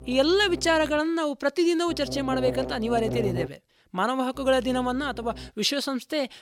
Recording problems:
electrical hum; noticeable; at the start, from 2 to 3.5 s and from 4.5 to 5.5 s; 60 Hz, 10 dB below the speech

